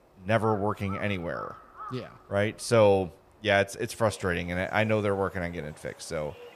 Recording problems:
animal sounds; noticeable; throughout; 20 dB below the speech

